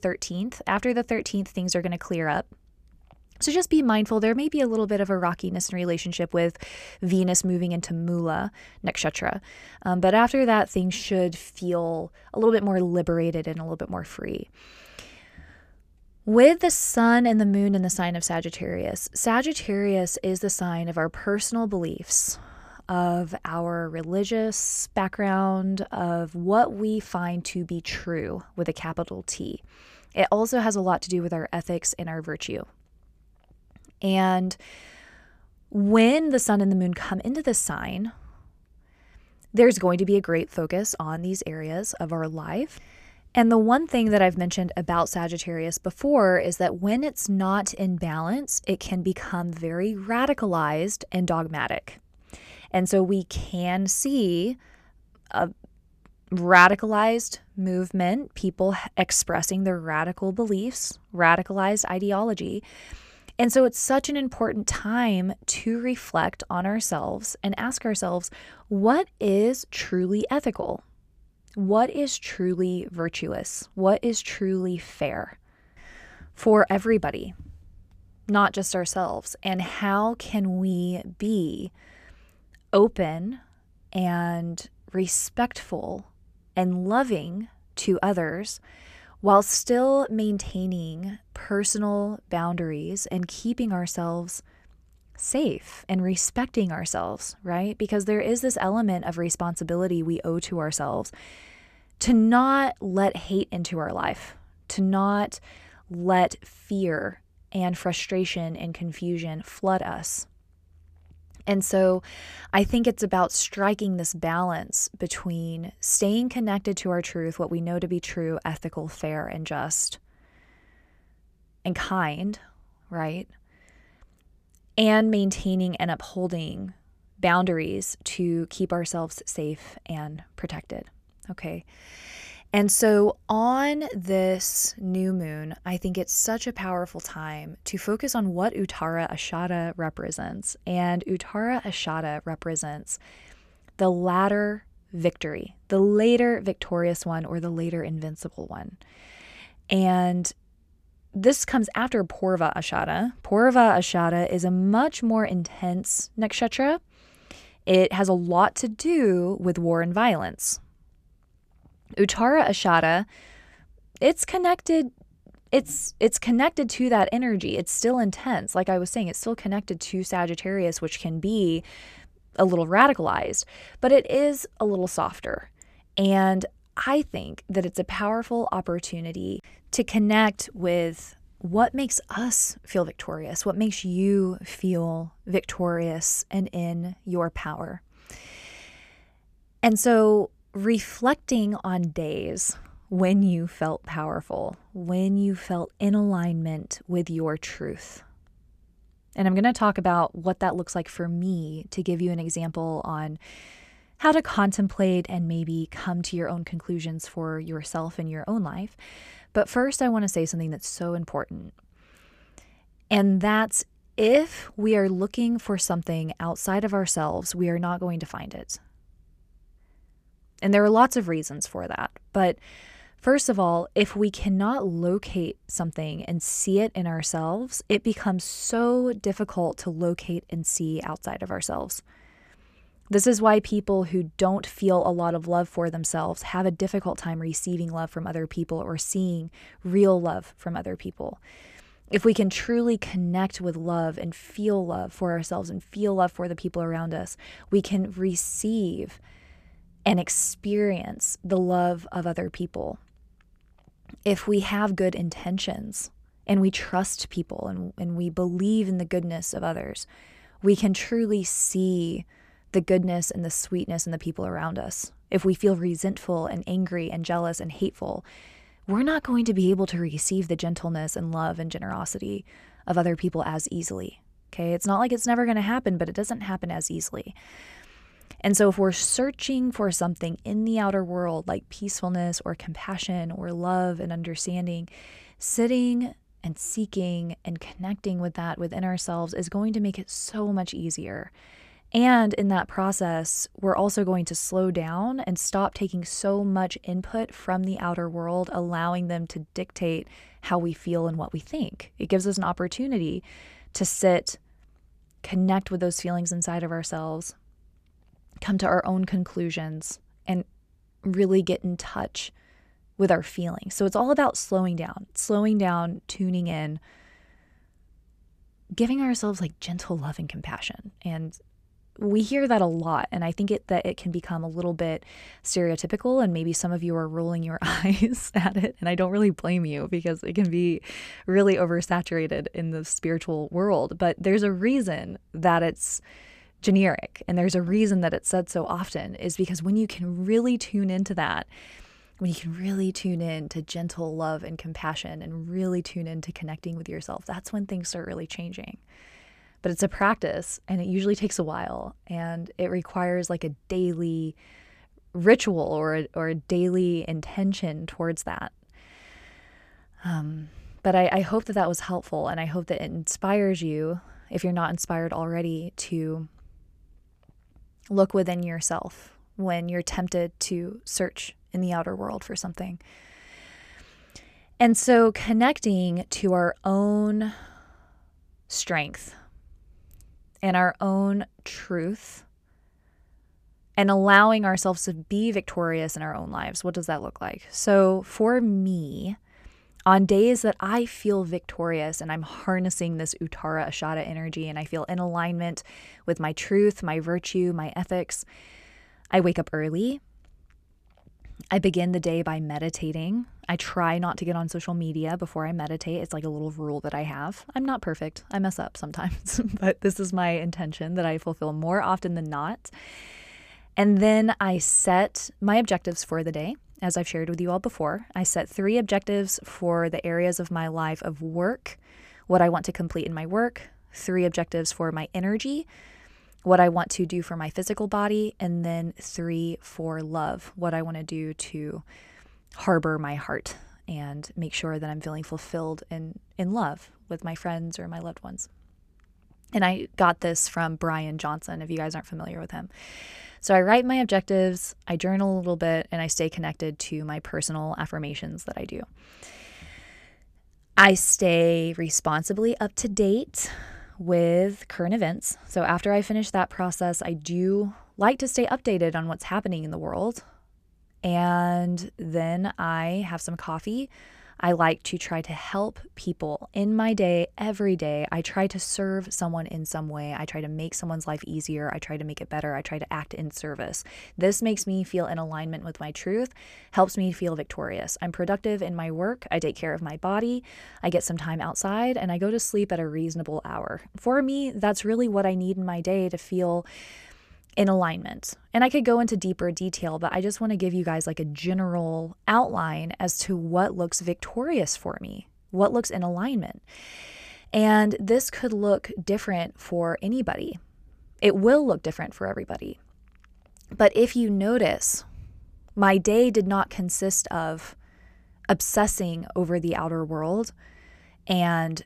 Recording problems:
none

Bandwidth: 14.5 kHz